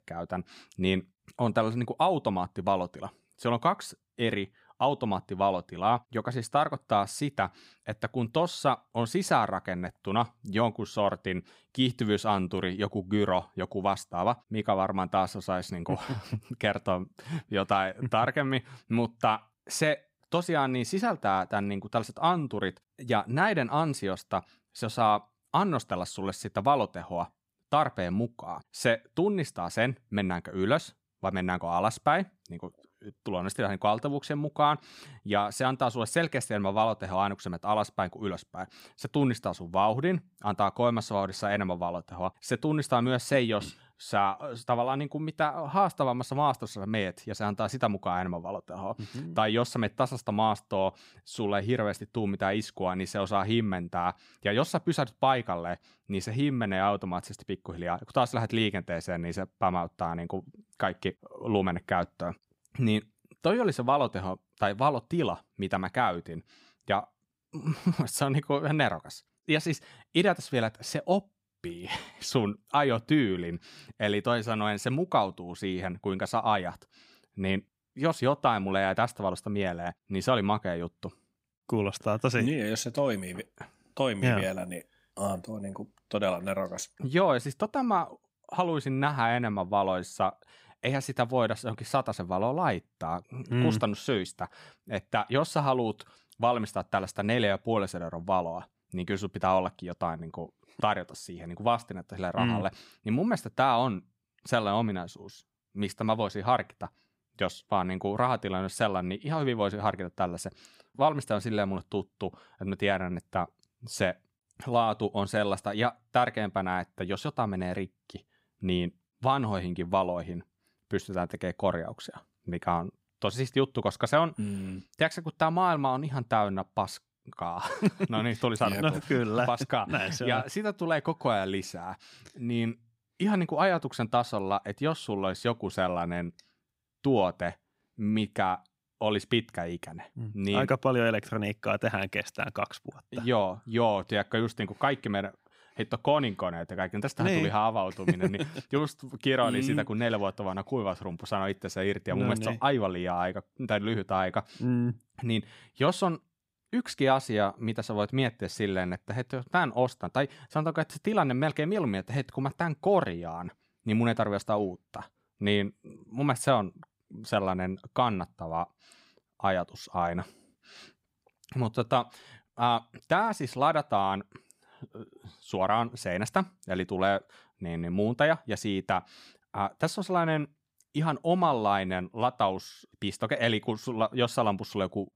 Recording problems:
none

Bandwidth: 15.5 kHz